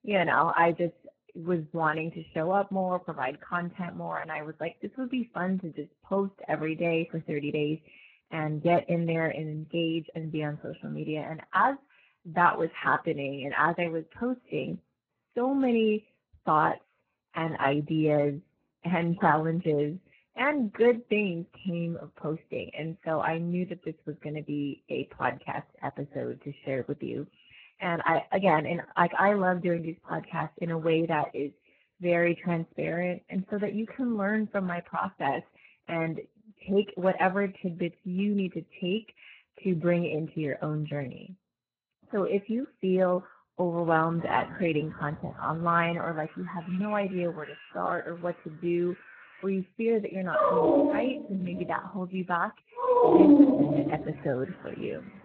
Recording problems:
garbled, watery; badly
animal sounds; very loud; from 44 s on; 6 dB above the speech

